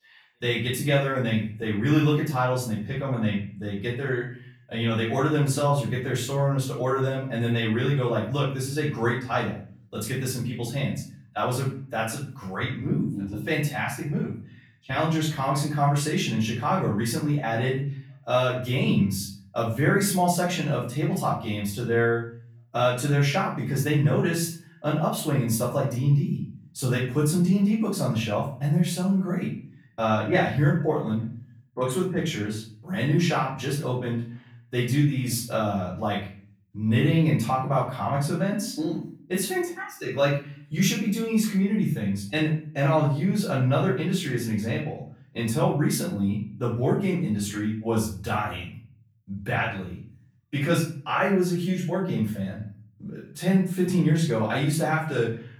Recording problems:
off-mic speech; far
room echo; noticeable; dies away in 0.5 s

